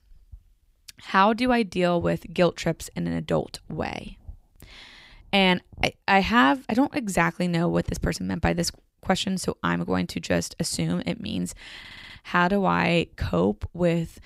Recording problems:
audio stuttering; at 12 s

